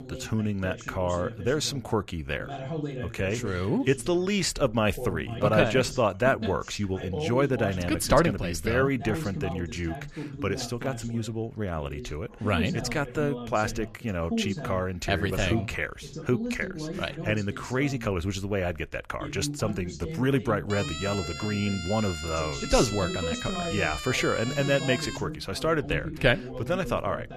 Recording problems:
voice in the background; loud; throughout; 9 dB below the speech
siren; noticeable; from 21 to 25 s; peak 6 dB below the speech

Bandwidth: 14.5 kHz